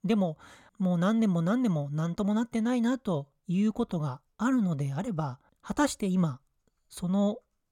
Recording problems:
none

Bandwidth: 17 kHz